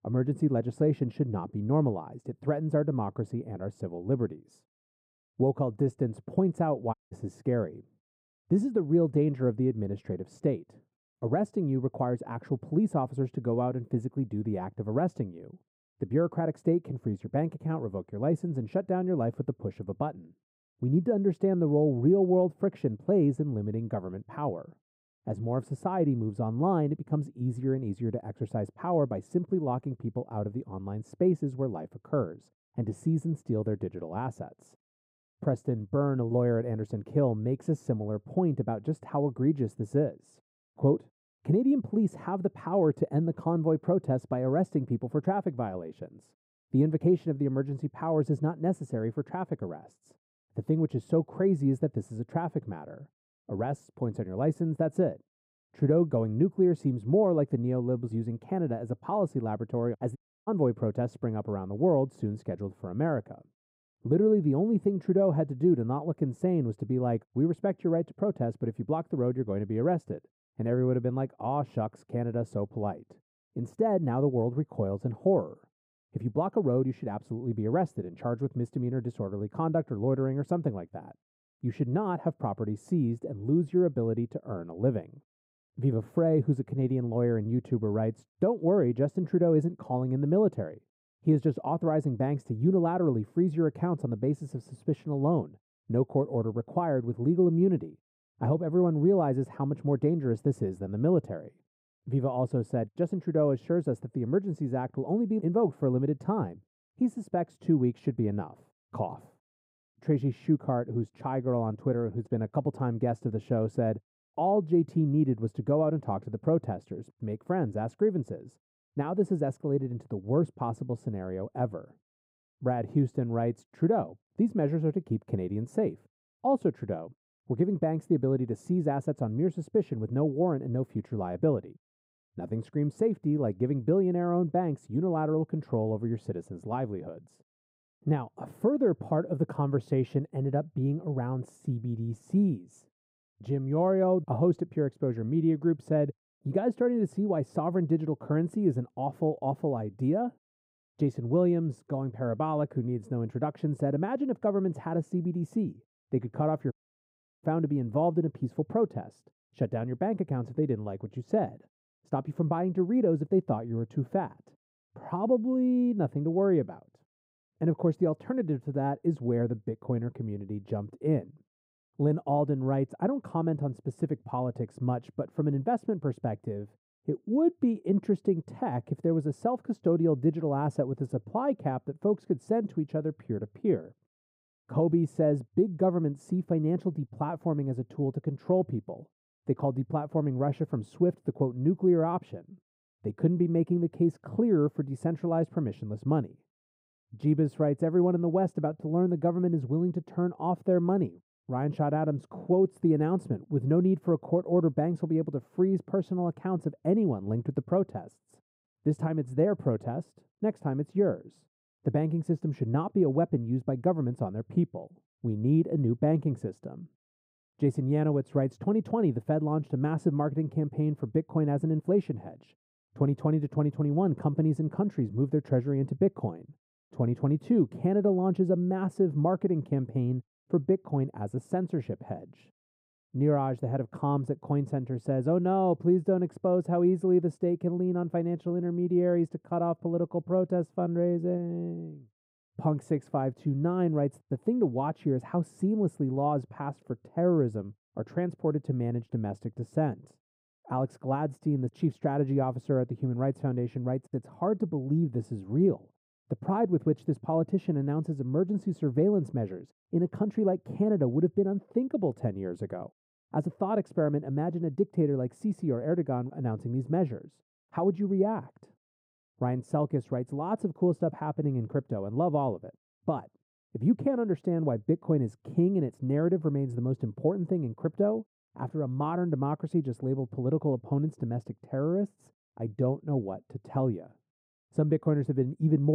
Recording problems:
muffled; very; fading above 1.5 kHz
audio cutting out; at 7 s, at 1:00 and at 2:37 for 0.5 s
abrupt cut into speech; at the end

